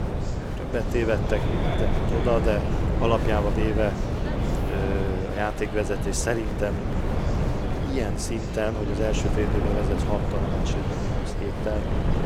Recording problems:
wind noise on the microphone; heavy; 4 dB below the speech
murmuring crowd; loud; throughout; 9 dB below the speech

